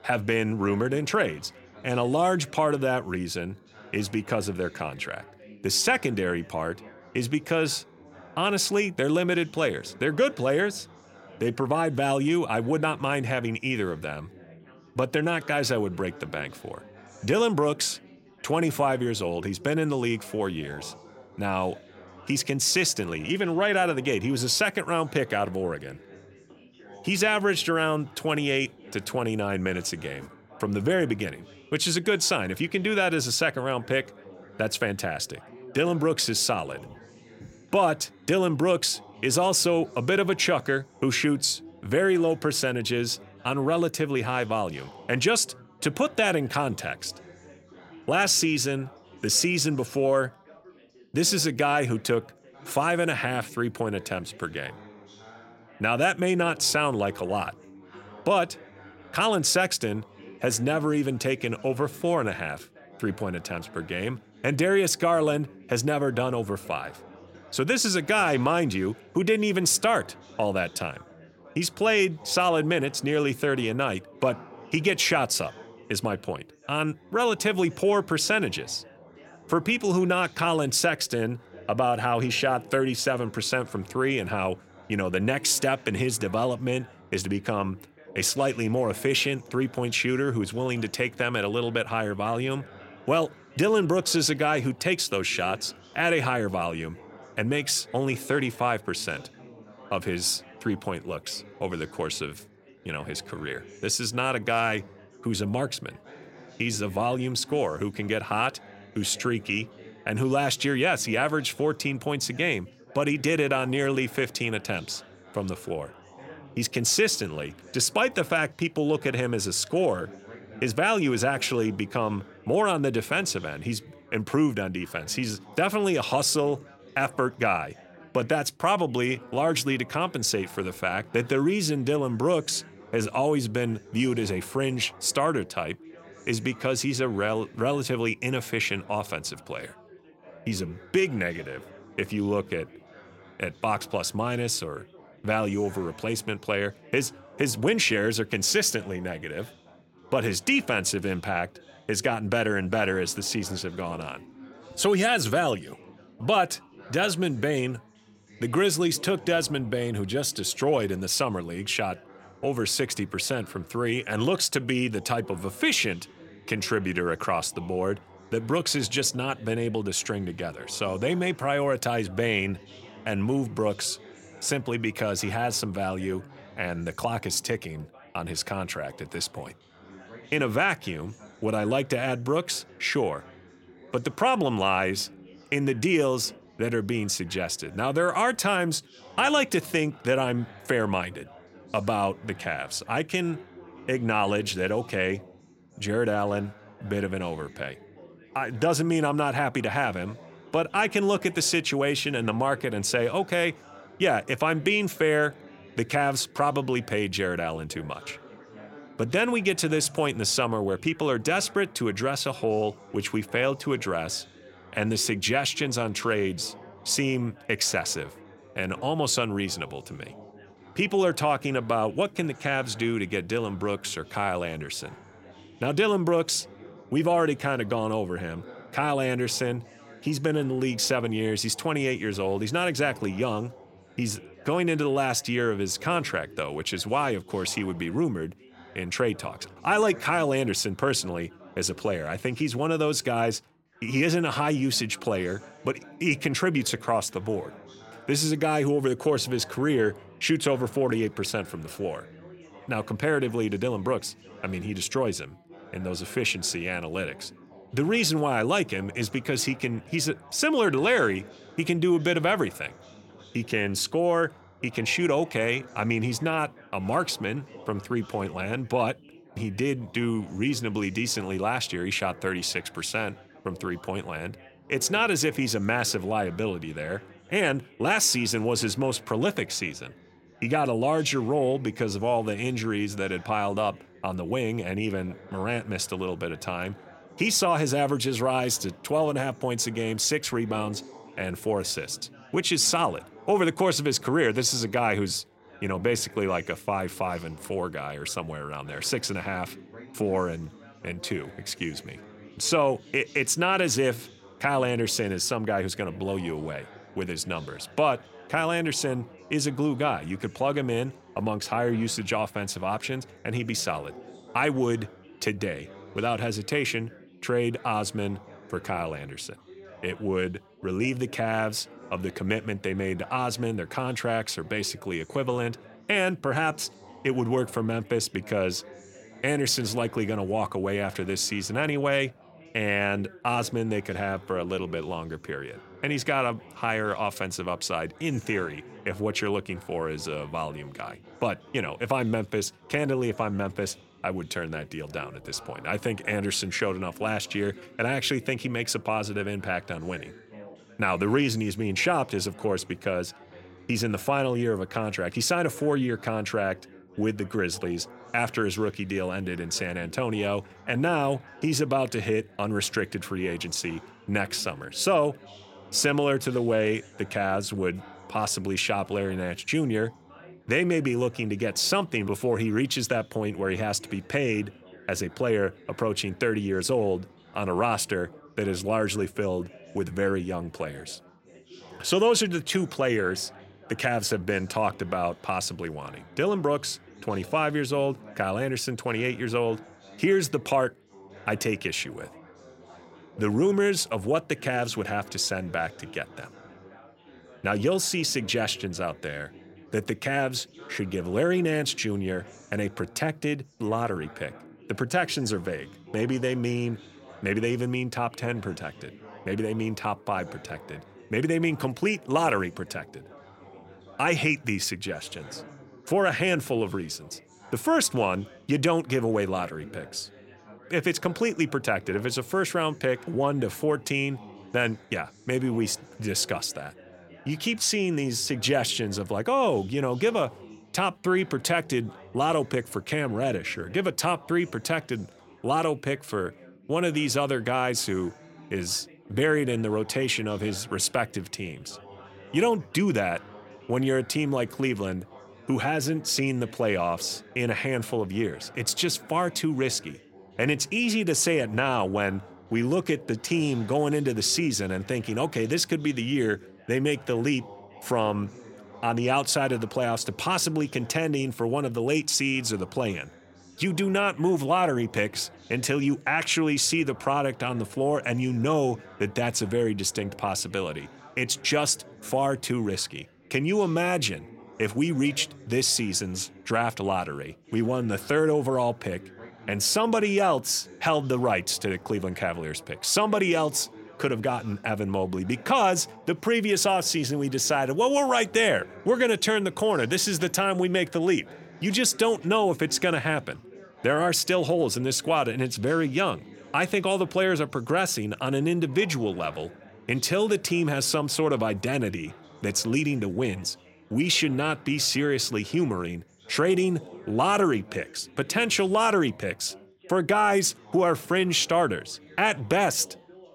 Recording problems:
background chatter; faint; throughout; 4 voices, 20 dB below the speech

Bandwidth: 16.5 kHz